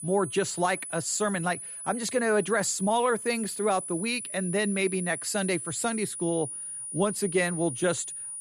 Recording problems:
high-pitched whine; loud; throughout; 9.5 kHz, 7 dB below the speech

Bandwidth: 15.5 kHz